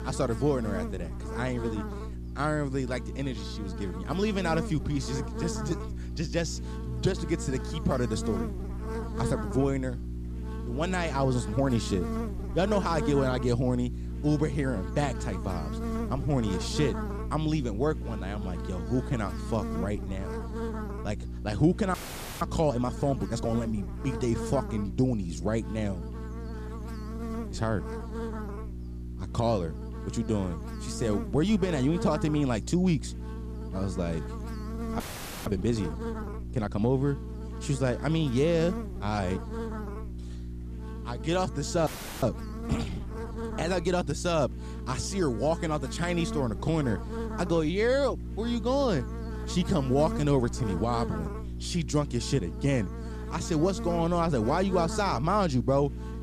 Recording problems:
electrical hum; noticeable; throughout; 60 Hz, 10 dB below the speech
audio freezing; at 22 s, at 35 s and at 42 s

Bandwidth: 14.5 kHz